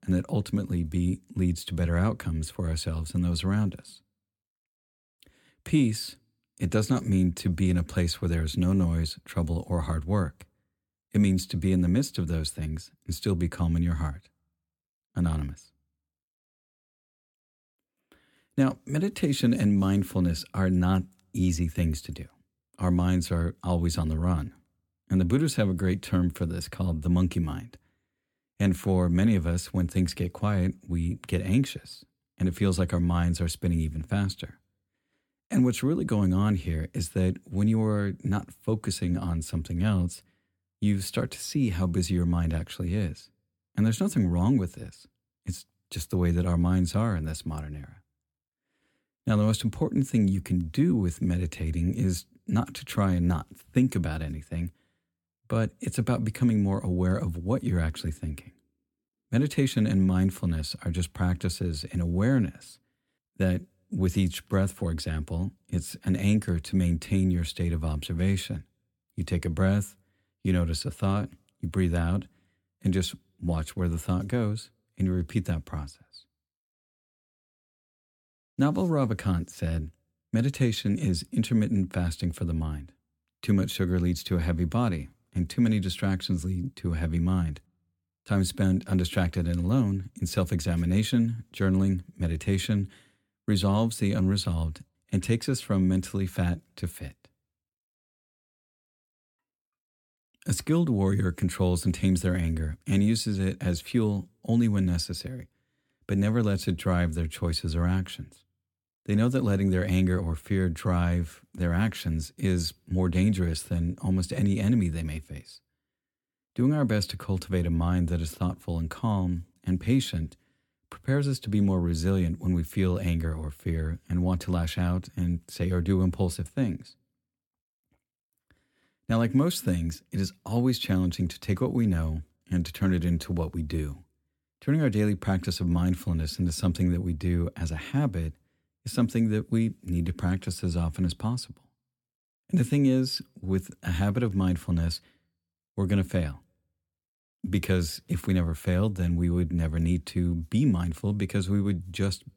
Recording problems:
none

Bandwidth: 17 kHz